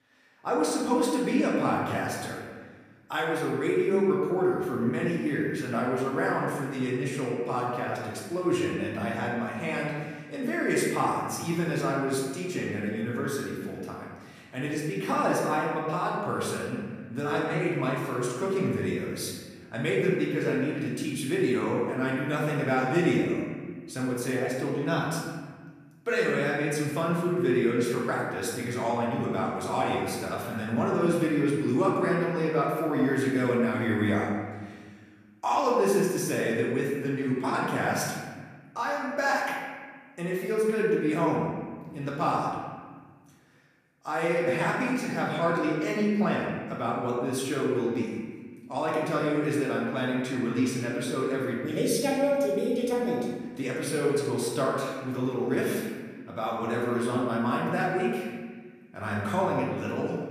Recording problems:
off-mic speech; far
room echo; noticeable; dies away in 1.5 s

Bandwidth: 14.5 kHz